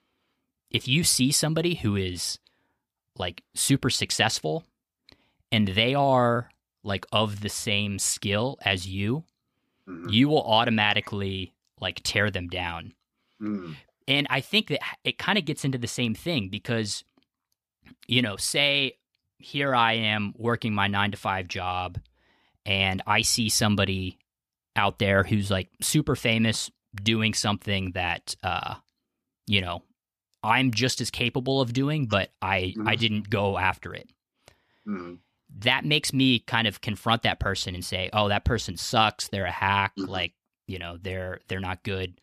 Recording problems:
none

